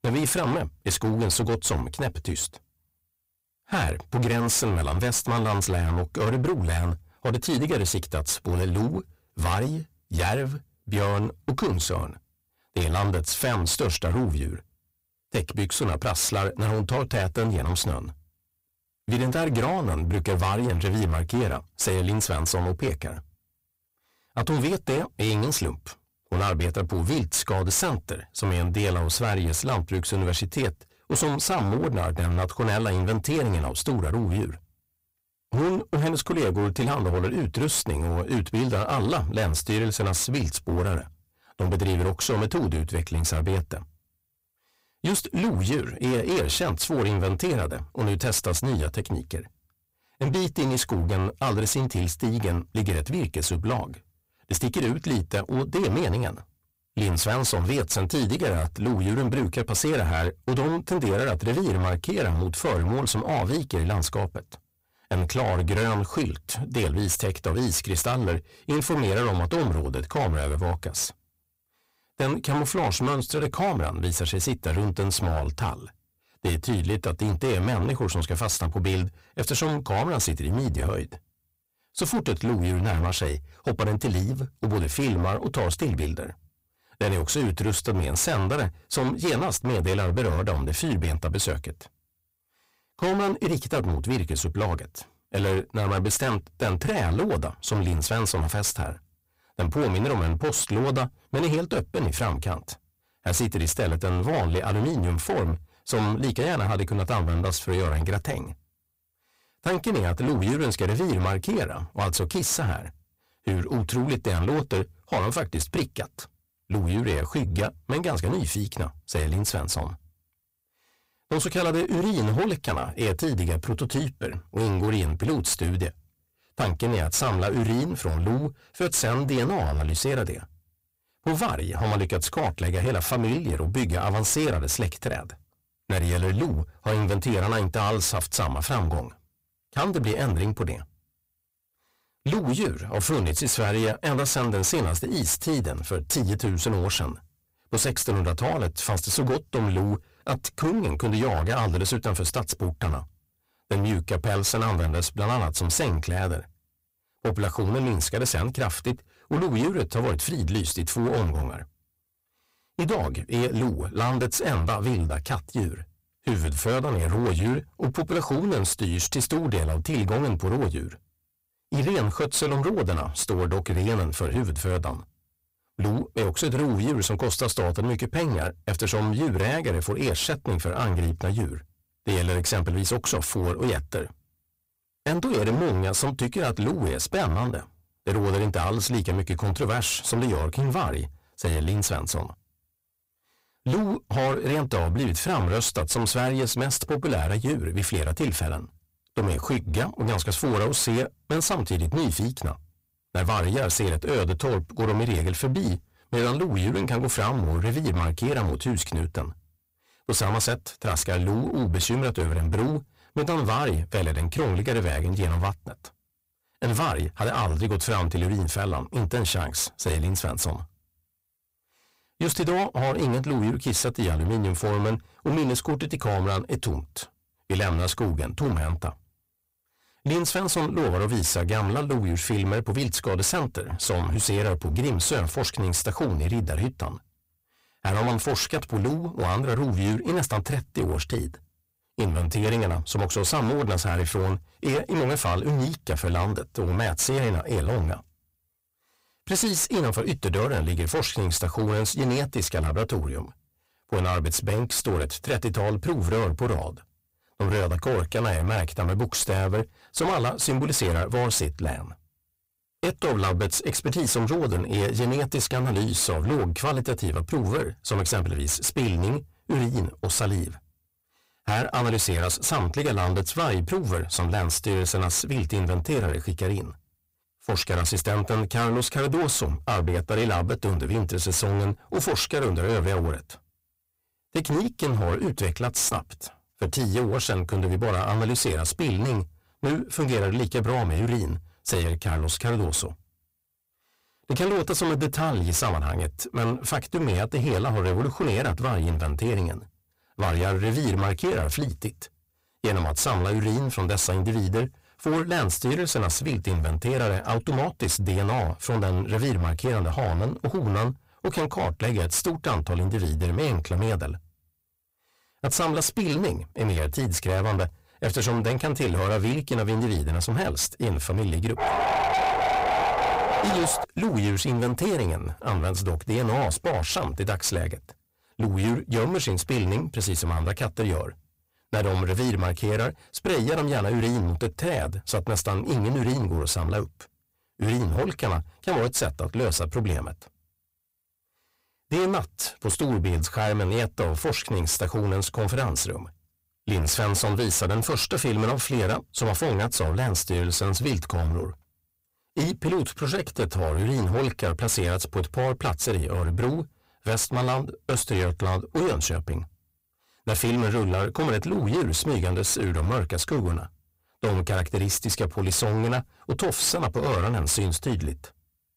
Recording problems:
distortion; heavy; 26% of the sound clipped
dog barking; loud; from 5:22 to 5:24; peak 3 dB above the speech

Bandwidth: 15.5 kHz